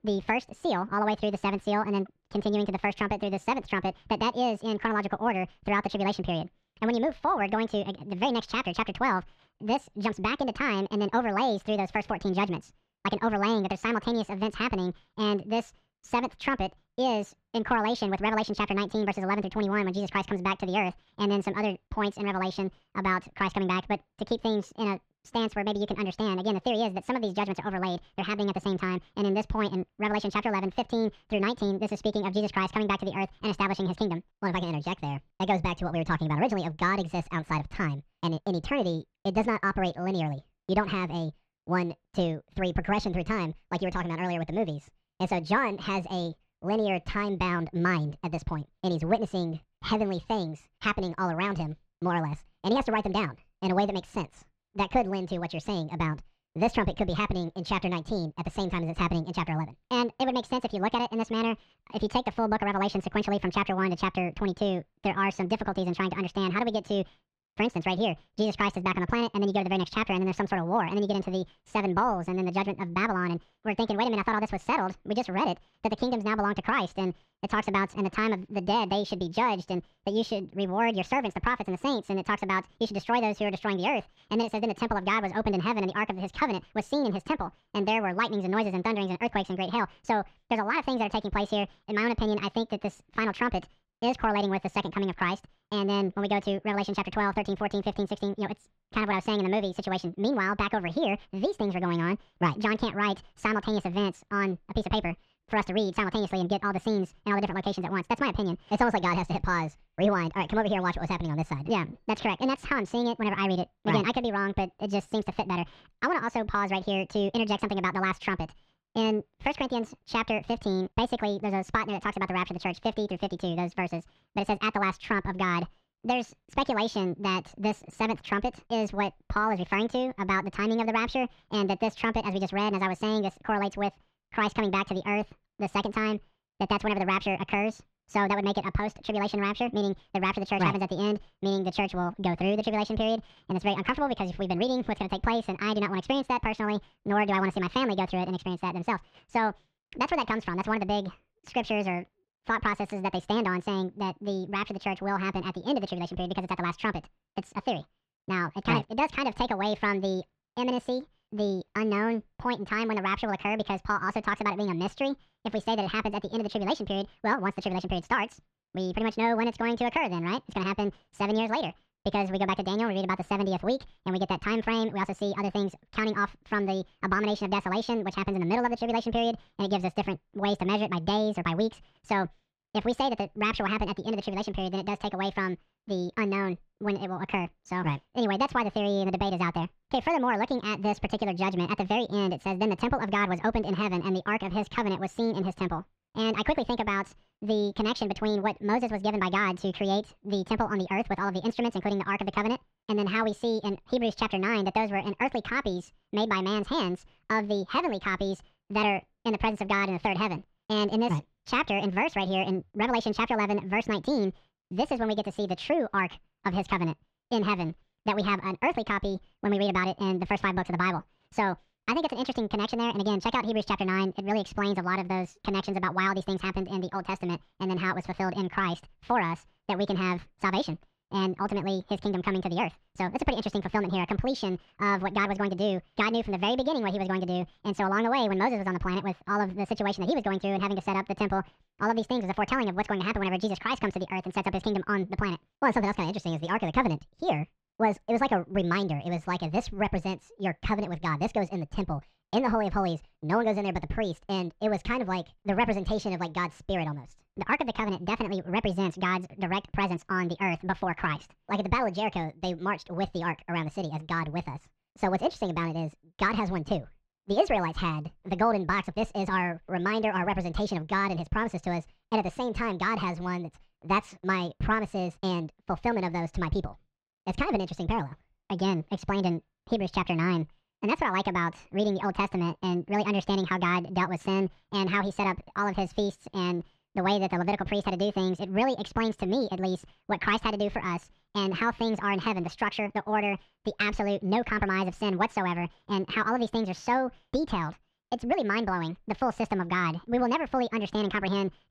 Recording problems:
wrong speed and pitch; too fast and too high; 1.7 times normal speed
muffled; very slightly; fading above 4 kHz

